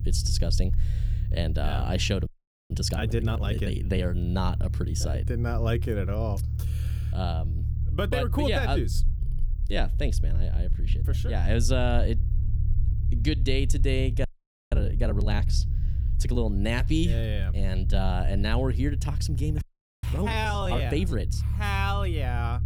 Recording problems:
low rumble; noticeable; throughout; 15 dB below the speech
audio freezing; at 2.5 s, at 14 s and at 20 s

